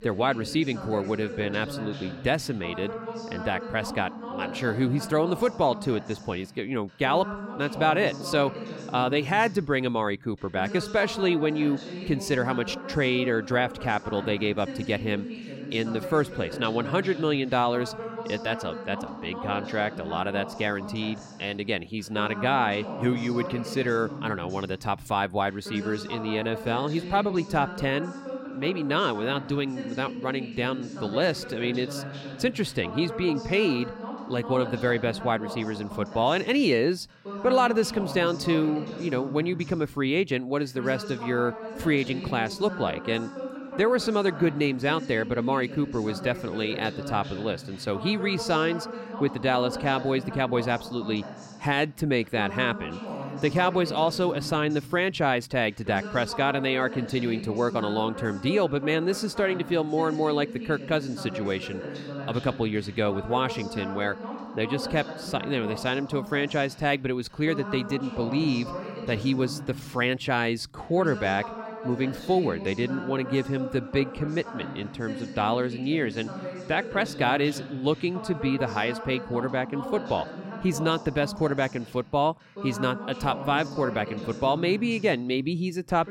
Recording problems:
voice in the background; noticeable; throughout; 10 dB below the speech

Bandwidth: 16 kHz